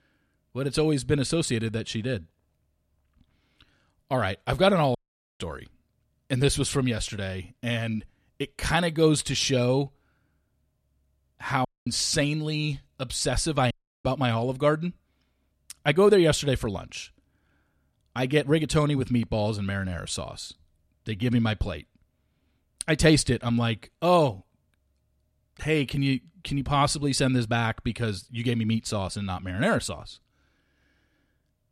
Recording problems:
audio cutting out; at 5 s, at 12 s and at 14 s

